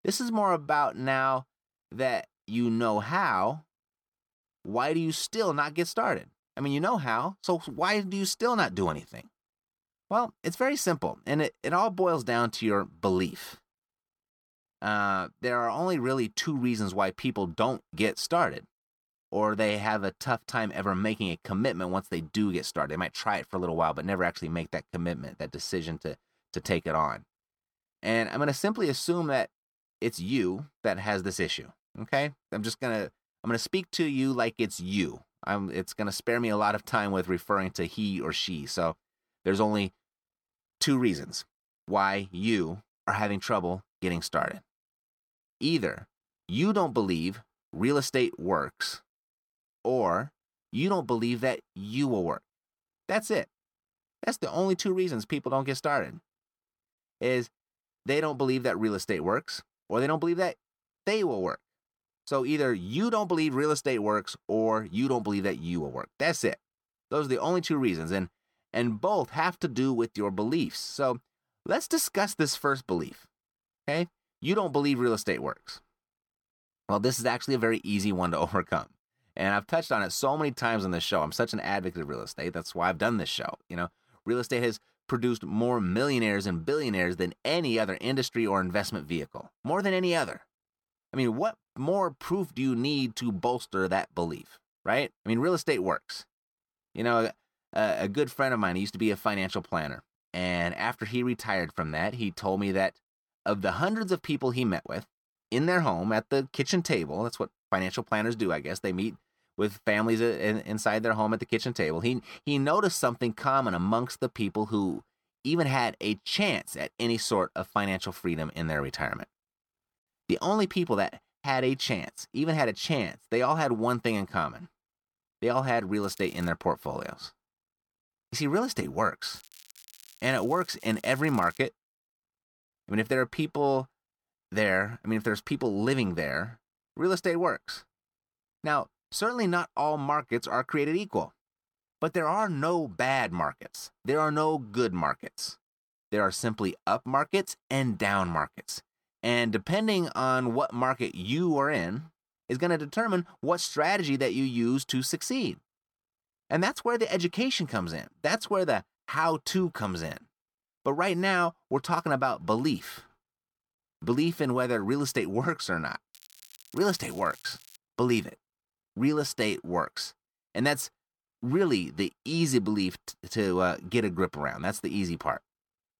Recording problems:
crackling; faint; at 2:06, from 2:09 to 2:12 and from 2:46 to 2:48; 20 dB below the speech

